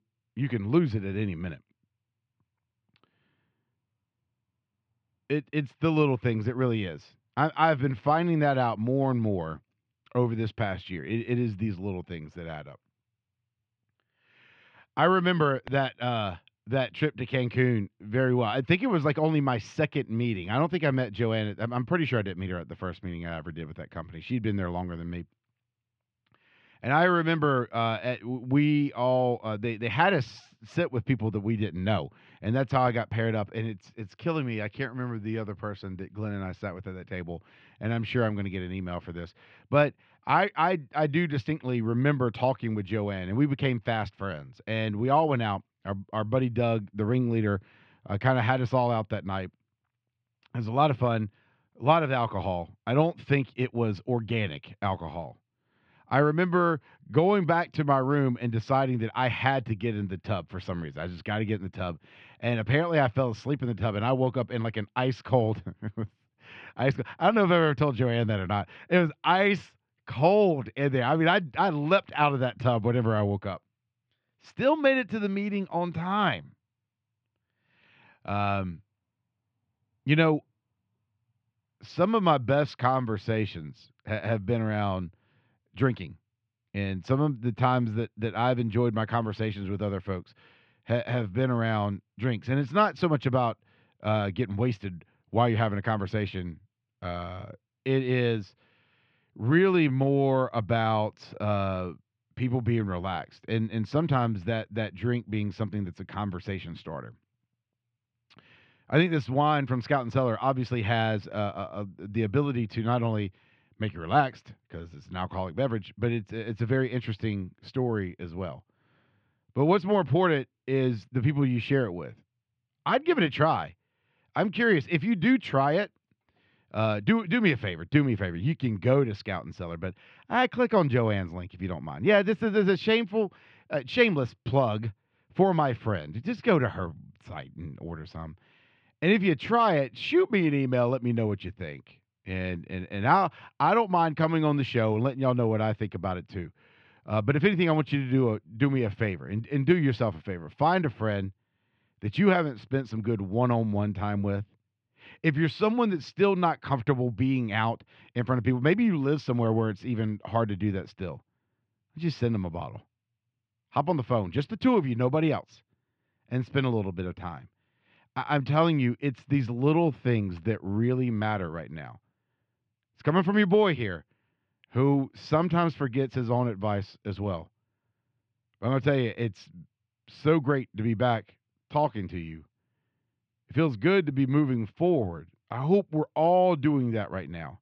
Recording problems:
muffled; slightly; fading above 3.5 kHz

